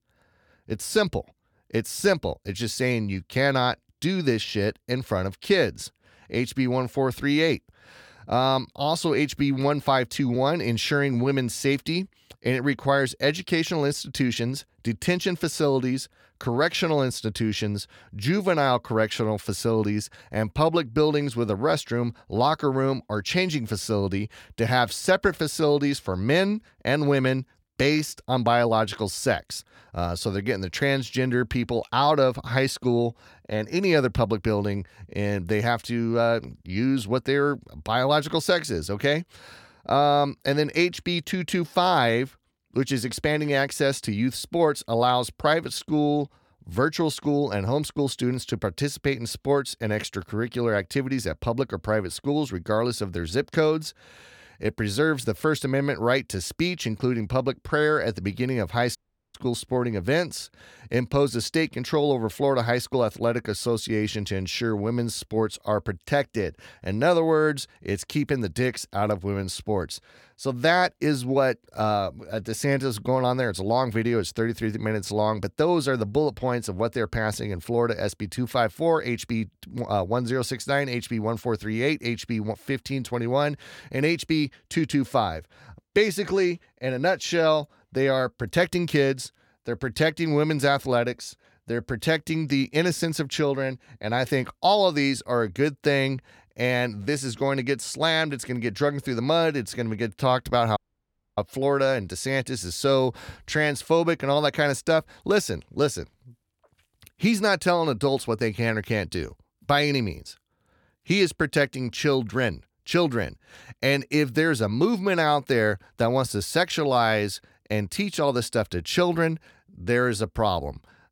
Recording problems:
audio cutting out; at 59 s and at 1:41 for 0.5 s

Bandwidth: 18 kHz